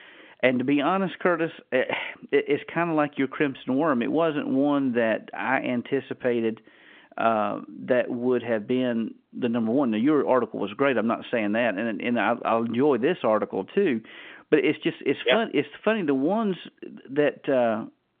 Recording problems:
phone-call audio; nothing above 3.5 kHz

